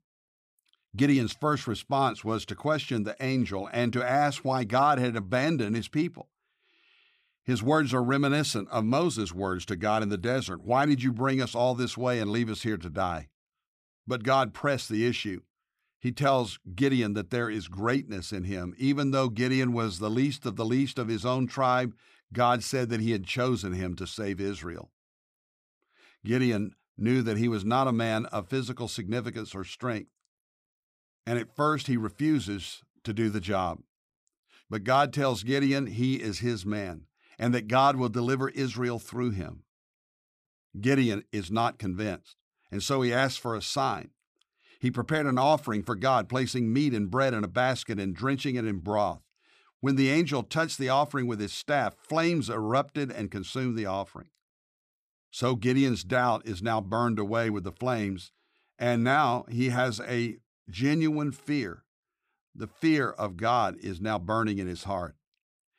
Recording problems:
none

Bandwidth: 15 kHz